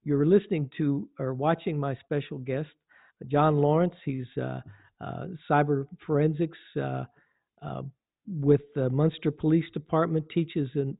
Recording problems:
high frequencies cut off; severe; nothing above 4 kHz

